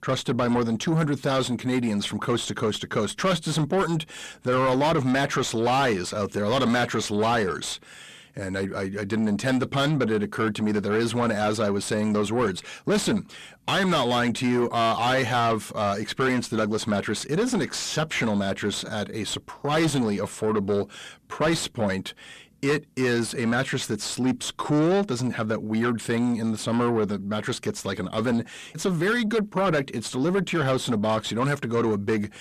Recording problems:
distortion; heavy; 6 dB below the speech

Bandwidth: 14 kHz